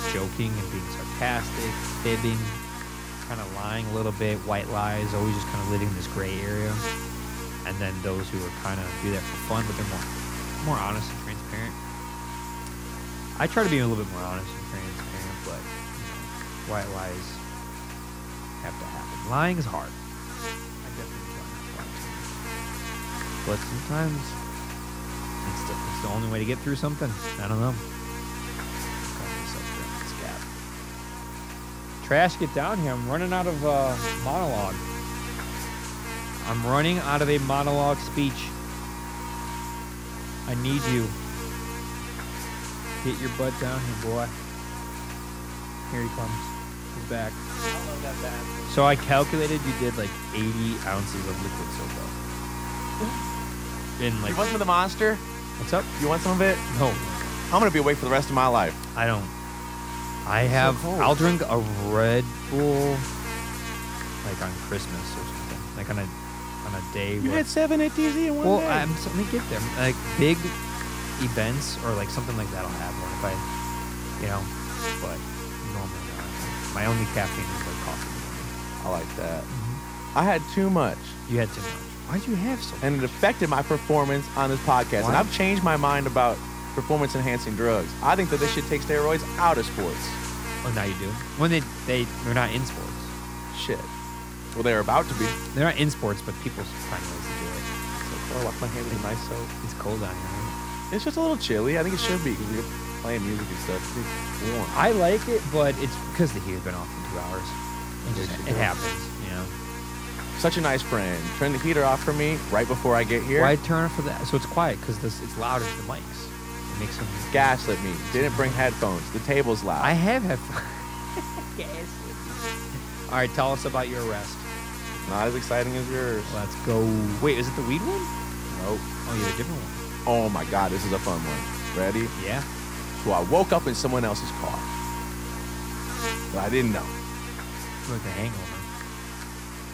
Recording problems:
electrical hum; loud; throughout; 60 Hz, 8 dB below the speech

